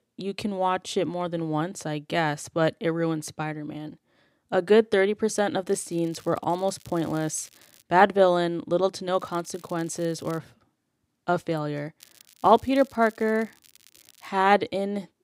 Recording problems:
crackling; faint; from 5.5 to 8 s, from 9 to 10 s and from 12 to 14 s; 25 dB below the speech

